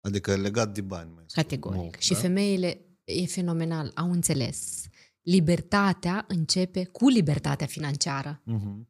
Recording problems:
audio stuttering; at 4.5 s

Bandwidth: 15 kHz